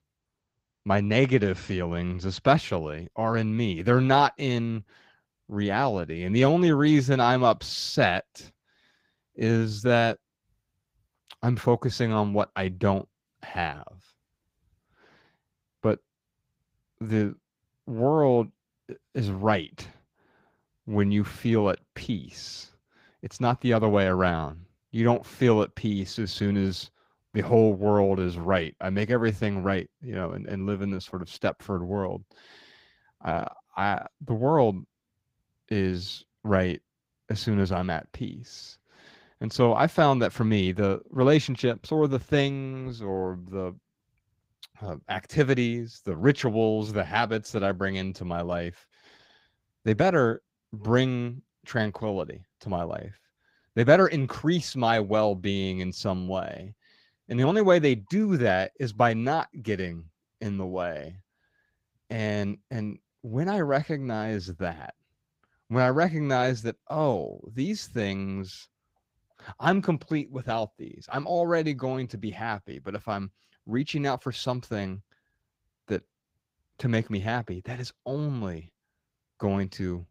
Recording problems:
garbled, watery; slightly; nothing above 15.5 kHz

